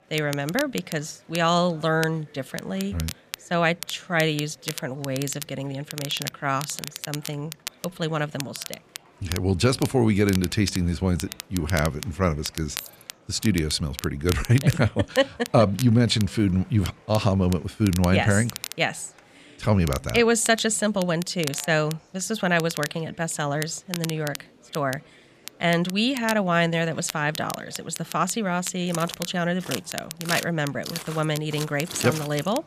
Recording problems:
crackle, like an old record; noticeable; 15 dB below the speech
murmuring crowd; faint; throughout; 30 dB below the speech
jangling keys; faint; at 13 s; peak 15 dB below the speech
footsteps; noticeable; from 29 s on; peak 6 dB below the speech

